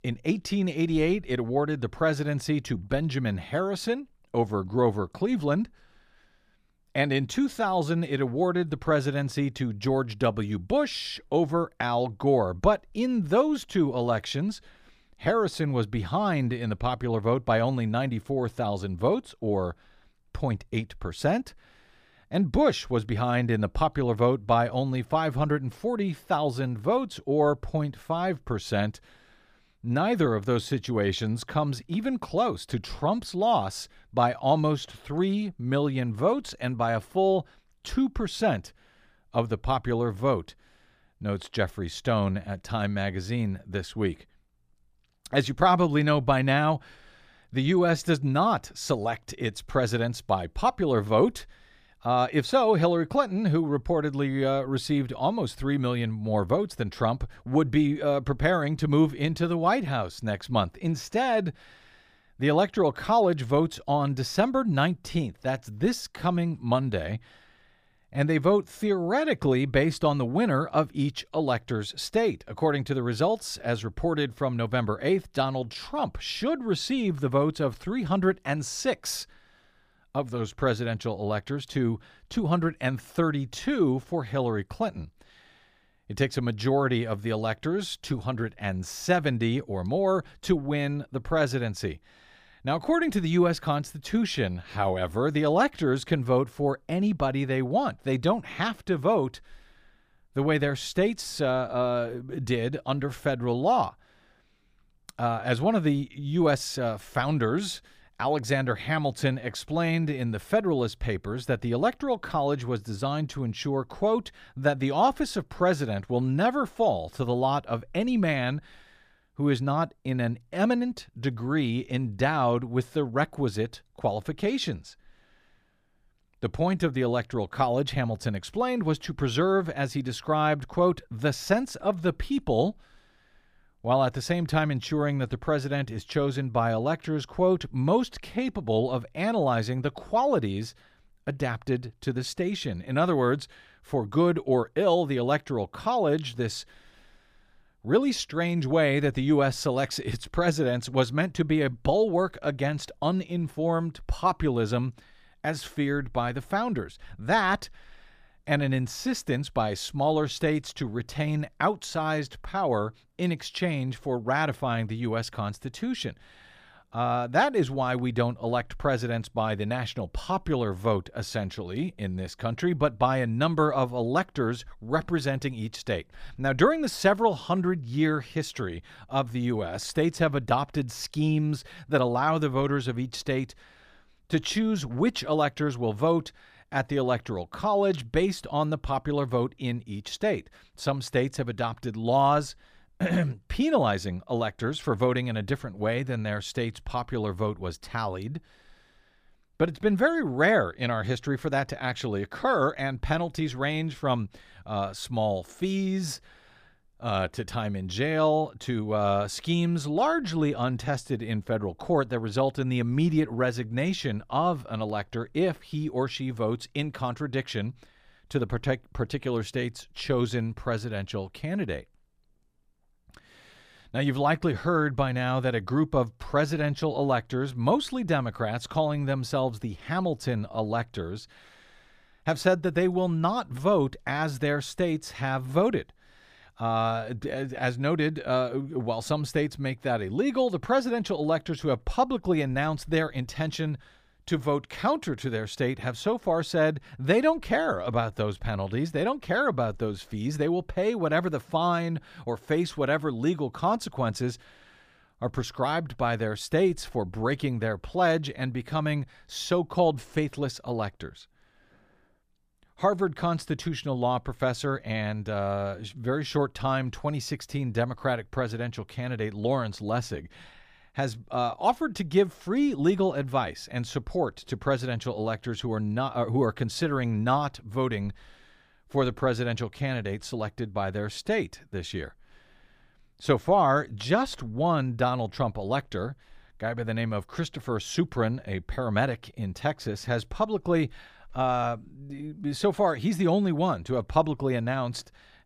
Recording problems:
none

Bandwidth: 15 kHz